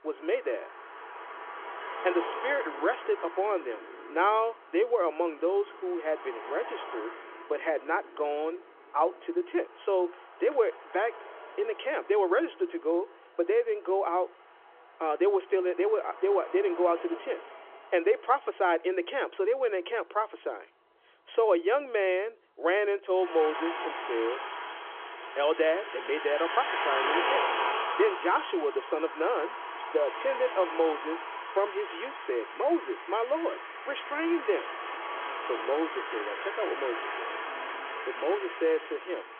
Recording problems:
phone-call audio
traffic noise; loud; throughout; 6 dB below the speech

